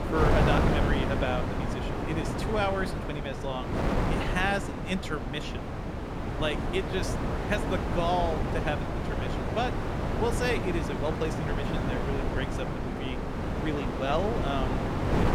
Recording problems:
wind noise on the microphone; heavy; 1 dB below the speech

